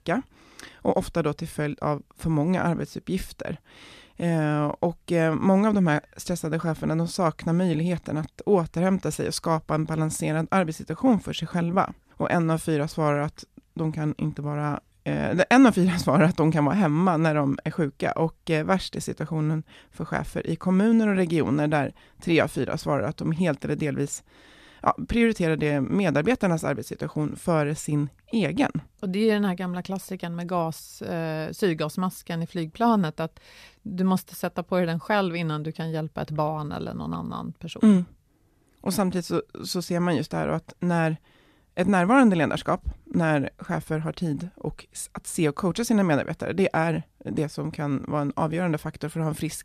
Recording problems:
none

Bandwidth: 14.5 kHz